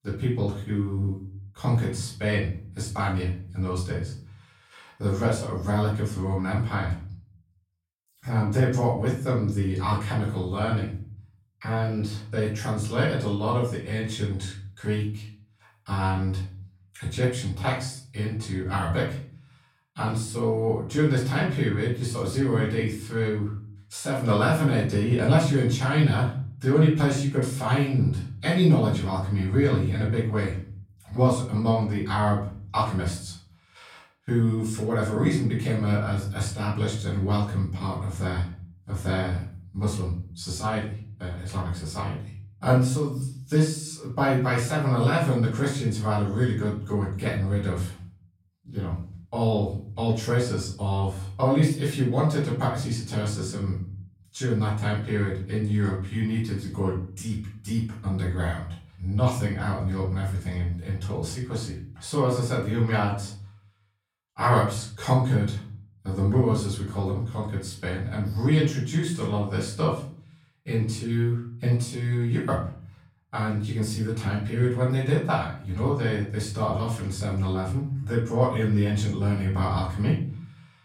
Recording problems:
off-mic speech; far
room echo; slight; dies away in 0.5 s

